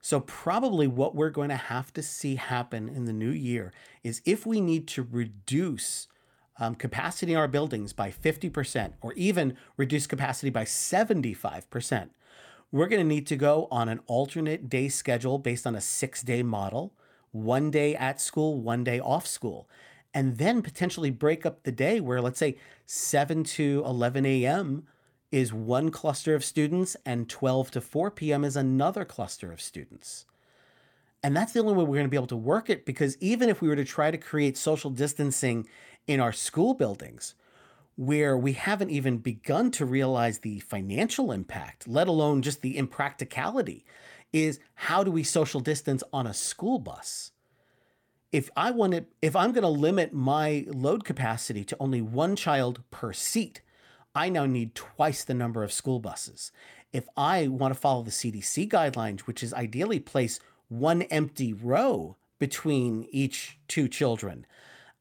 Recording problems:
none

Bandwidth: 17.5 kHz